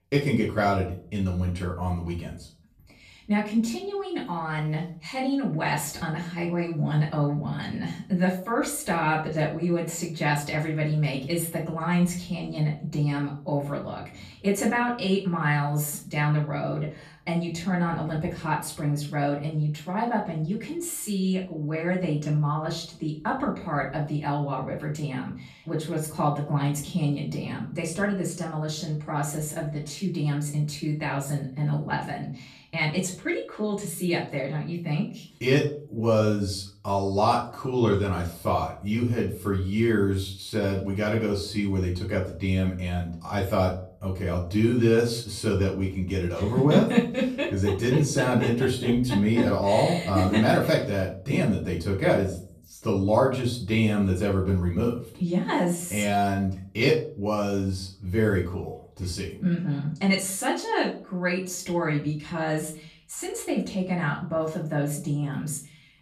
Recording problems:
off-mic speech; far
room echo; slight; dies away in 0.4 s

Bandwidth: 14.5 kHz